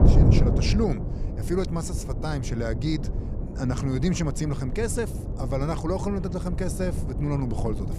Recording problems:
wind noise on the microphone; heavy; 6 dB below the speech

